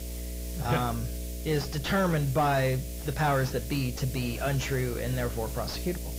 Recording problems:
garbled, watery; badly; nothing above 7.5 kHz
distortion; slight; 9 dB below the speech
electrical hum; noticeable; throughout; 60 Hz, 20 dB below the speech
hiss; noticeable; throughout; 15 dB below the speech

